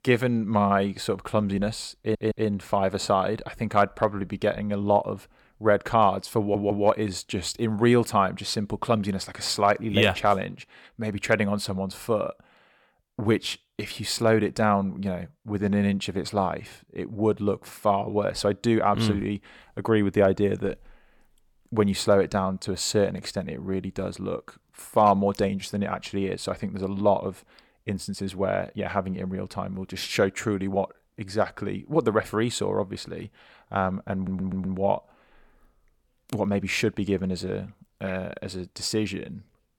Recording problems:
audio stuttering; at 2 s, at 6.5 s and at 34 s

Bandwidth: 18 kHz